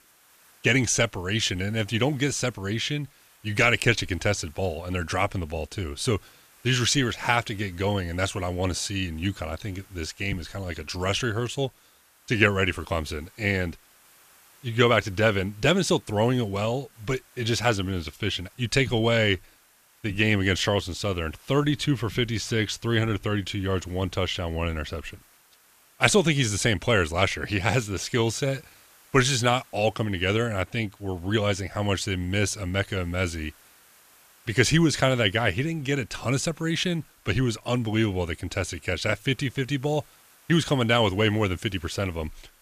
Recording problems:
hiss; faint; throughout; 30 dB below the speech

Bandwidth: 14.5 kHz